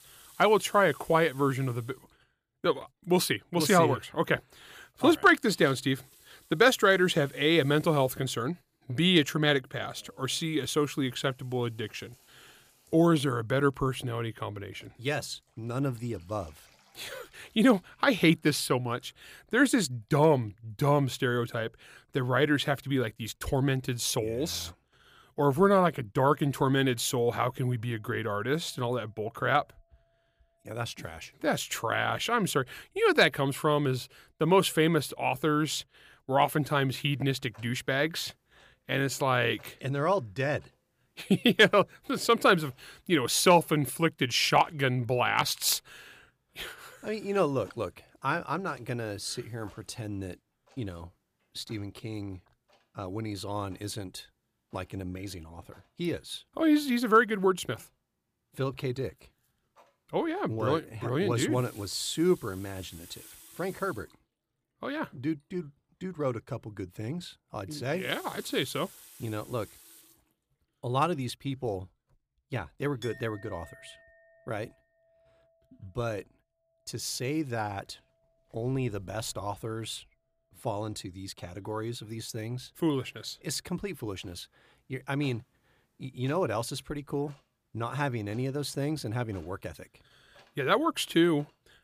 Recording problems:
household noises; faint; throughout; 25 dB below the speech

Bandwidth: 15 kHz